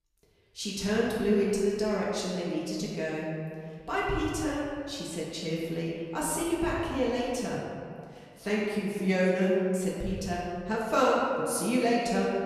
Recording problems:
room echo; strong; dies away in 1.9 s
off-mic speech; far

